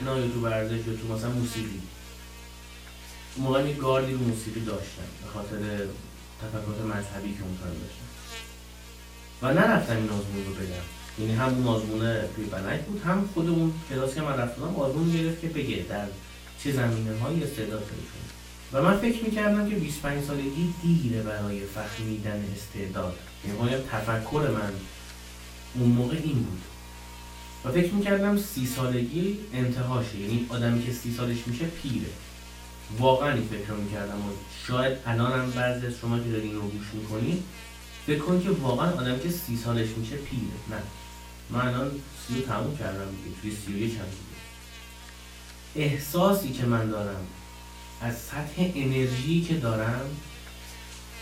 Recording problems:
off-mic speech; far
room echo; slight; dies away in 0.3 s
electrical hum; noticeable; throughout; 60 Hz, 15 dB below the speech
abrupt cut into speech; at the start

